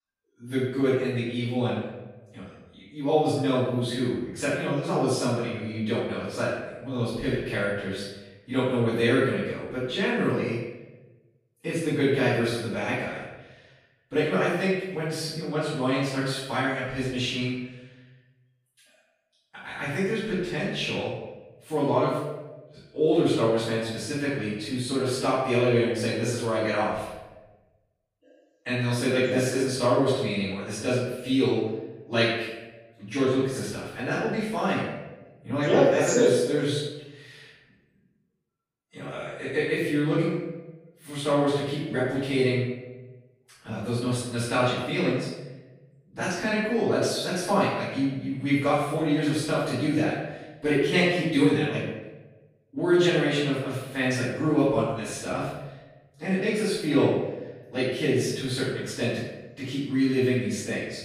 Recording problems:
room echo; strong; dies away in 0.9 s
off-mic speech; far

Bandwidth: 15.5 kHz